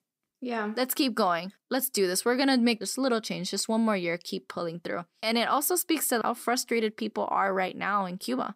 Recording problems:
none

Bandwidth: 15.5 kHz